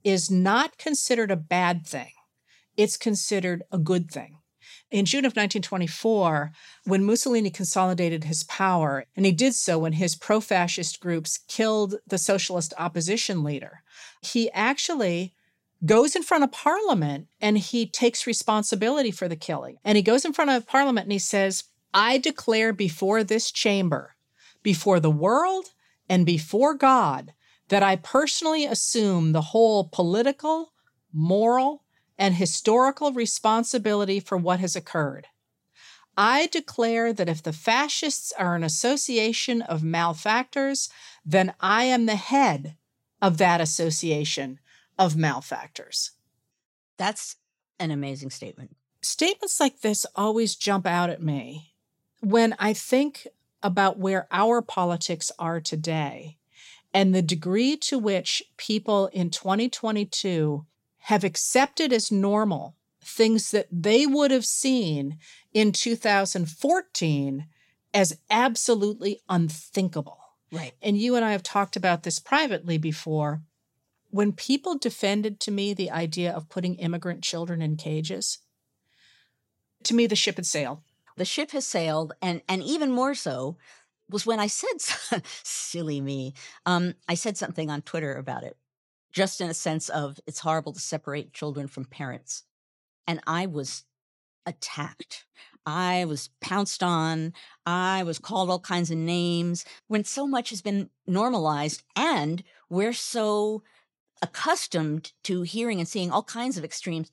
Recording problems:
none

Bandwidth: 16 kHz